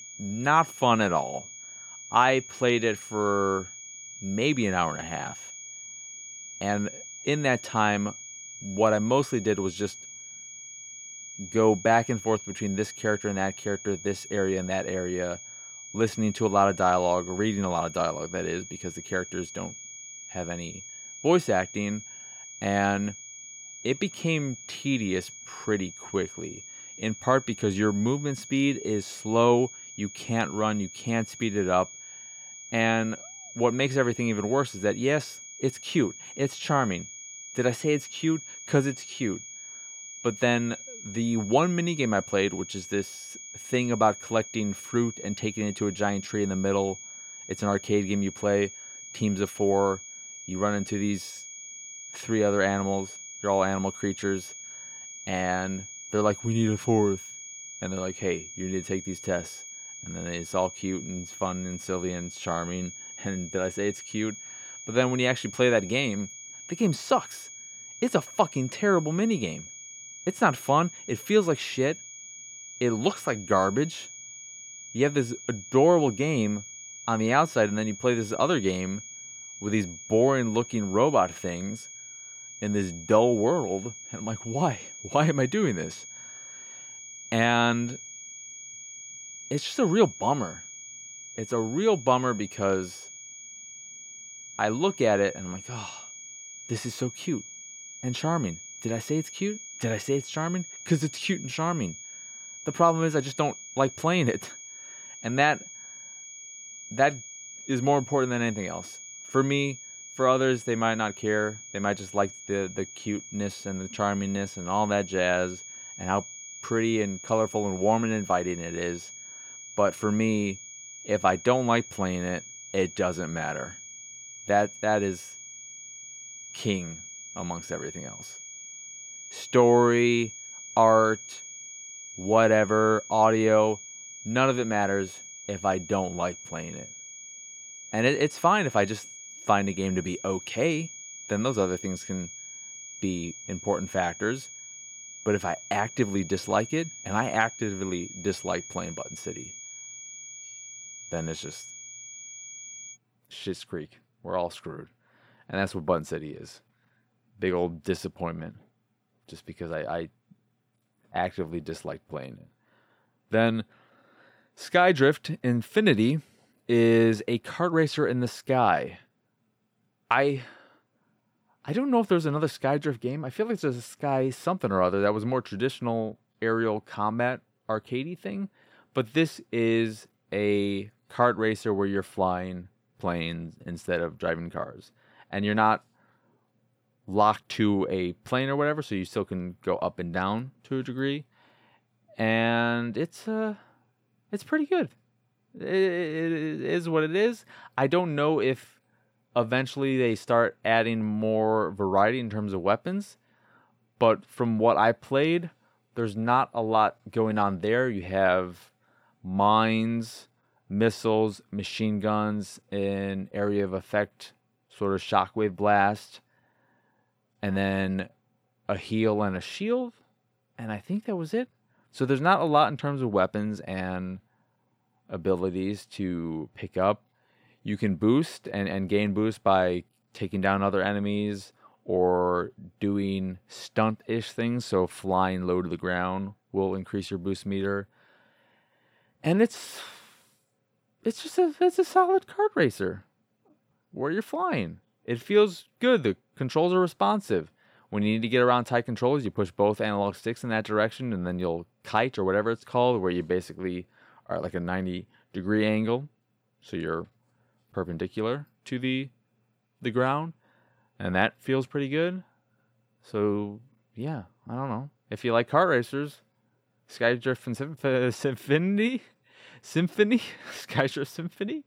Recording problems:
high-pitched whine; noticeable; until 2:33; 6.5 kHz, 15 dB below the speech

